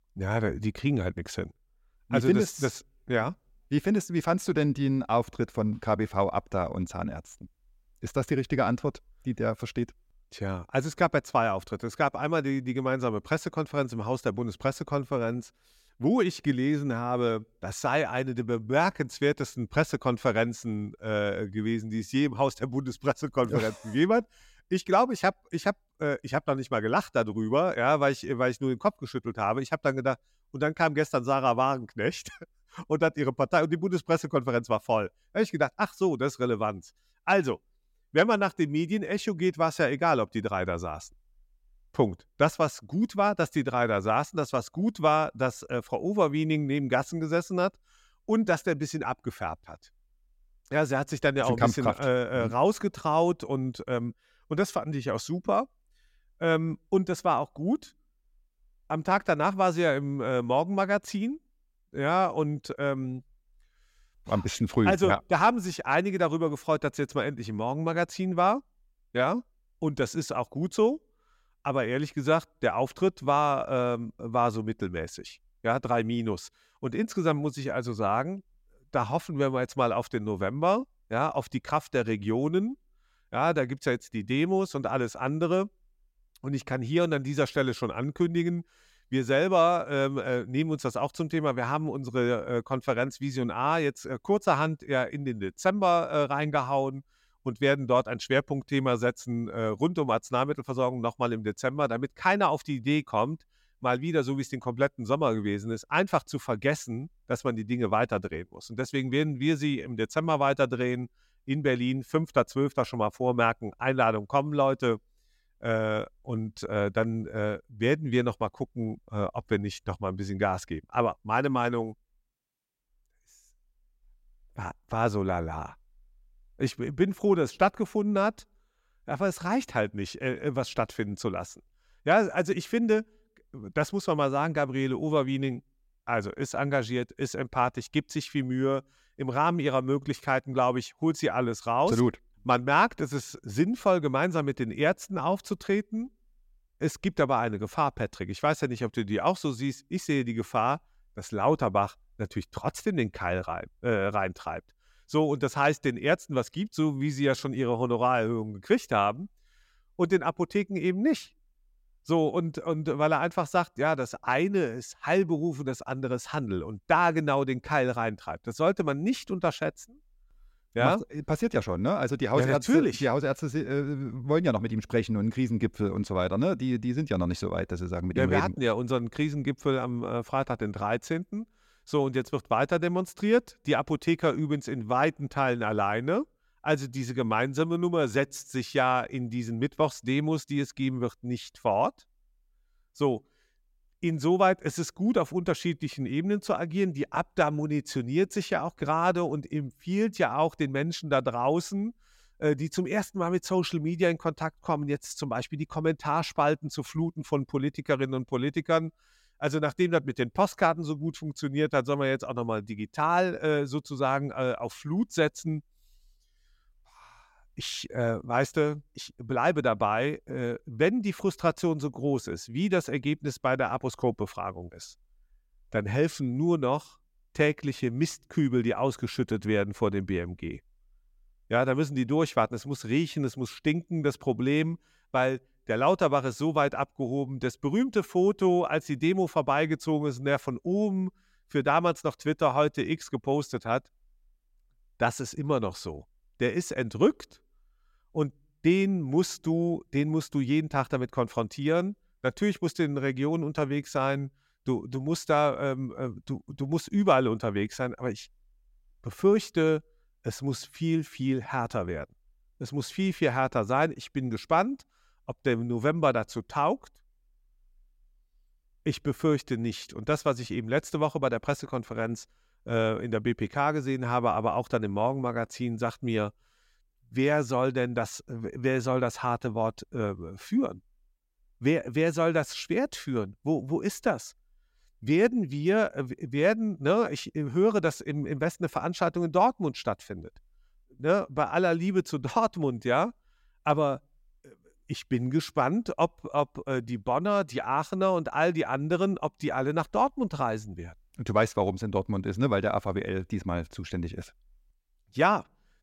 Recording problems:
none

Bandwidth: 16 kHz